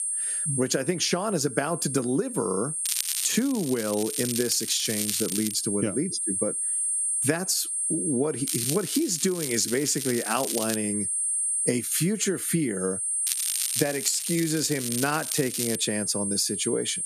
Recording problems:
squashed, flat; somewhat
high-pitched whine; loud; throughout; 8.5 kHz, 2 dB below the speech
crackling; loud; from 3 to 5.5 s, from 8.5 to 11 s and from 13 to 16 s; 5 dB below the speech

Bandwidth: 14.5 kHz